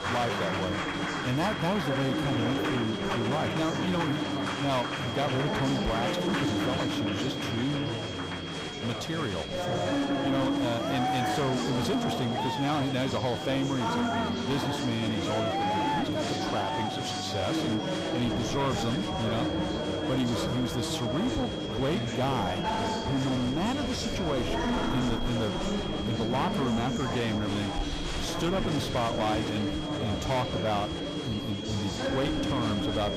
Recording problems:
distortion; slight; 14% of the sound clipped
murmuring crowd; very loud; throughout; as loud as the speech
high-pitched whine; loud; throughout; 3.5 kHz, 8 dB below the speech

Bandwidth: 15.5 kHz